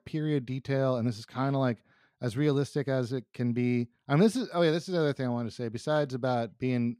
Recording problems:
none

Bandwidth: 15.5 kHz